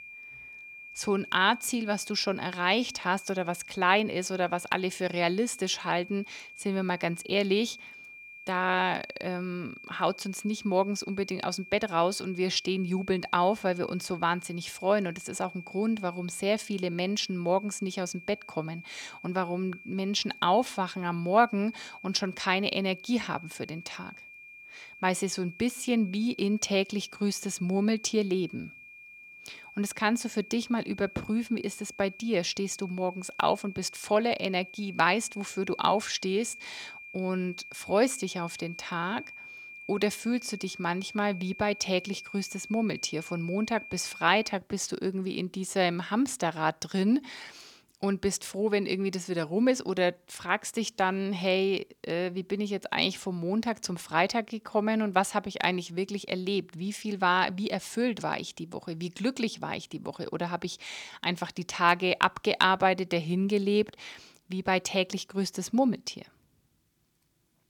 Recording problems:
high-pitched whine; noticeable; until 45 s; 2.5 kHz, 15 dB below the speech

